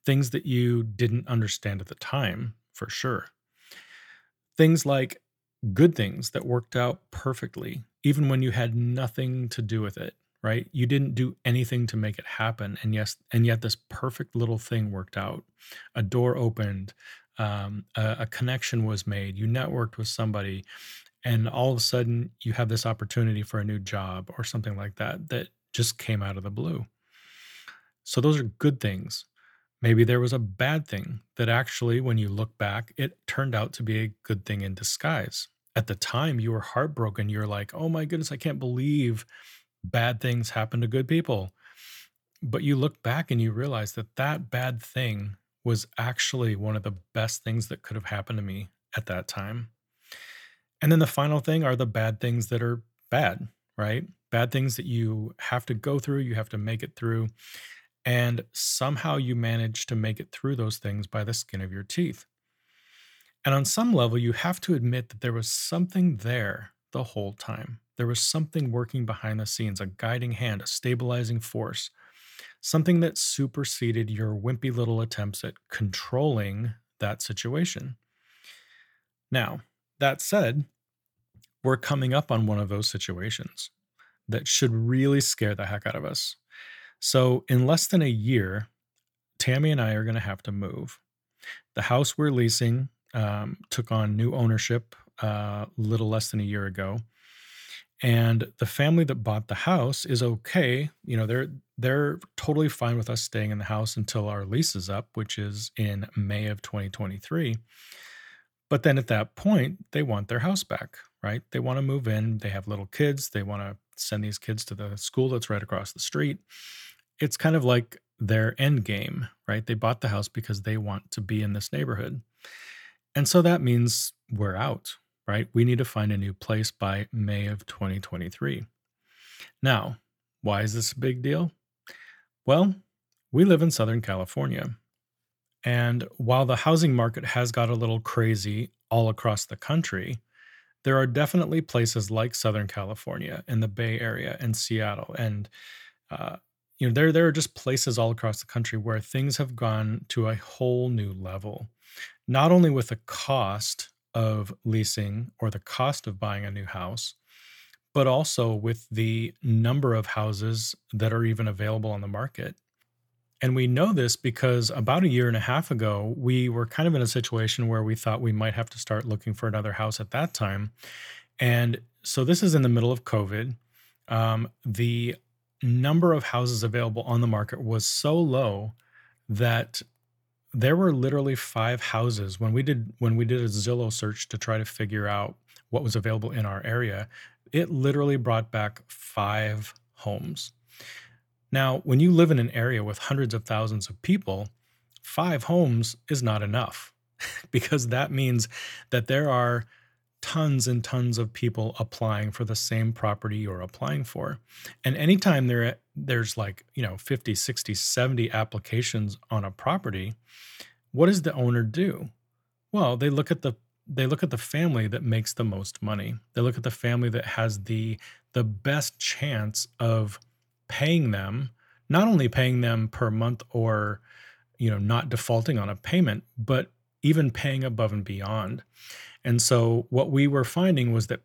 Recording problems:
uneven, jittery; strongly; from 6.5 s to 3:10

